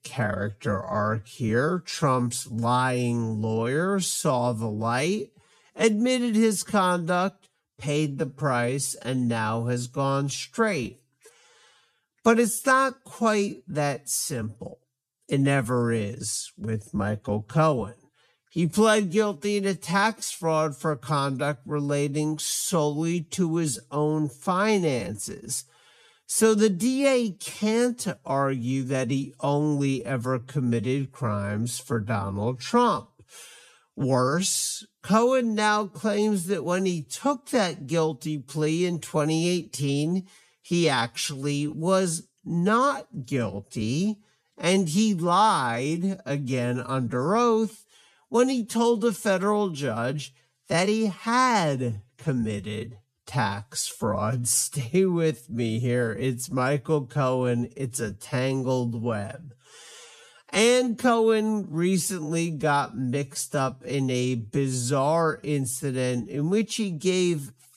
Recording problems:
wrong speed, natural pitch; too slow; 0.6 times normal speed

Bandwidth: 14.5 kHz